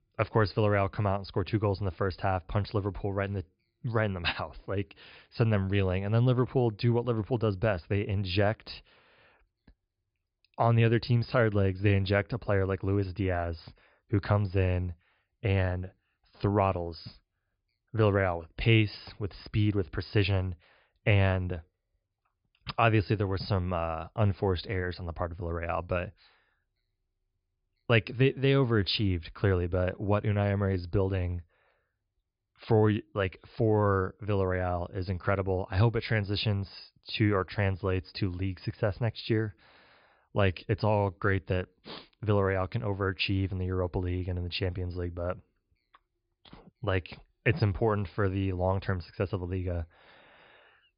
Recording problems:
high frequencies cut off; noticeable; nothing above 5 kHz

